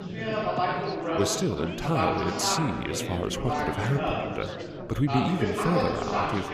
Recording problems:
chatter from many people; loud; throughout; as loud as the speech

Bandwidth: 15.5 kHz